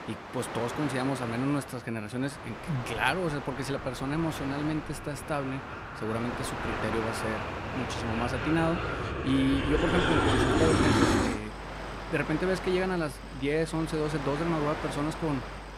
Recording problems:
train or aircraft noise; loud; throughout; 1 dB below the speech

